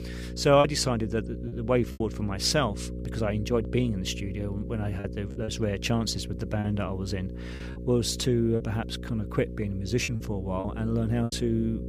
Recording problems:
electrical hum; noticeable; throughout; 60 Hz, 15 dB below the speech
choppy; very; 5% of the speech affected

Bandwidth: 15 kHz